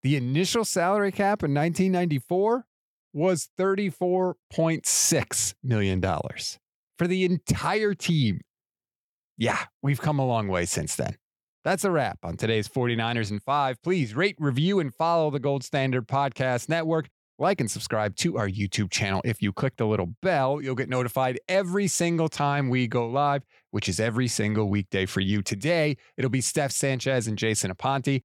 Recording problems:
none

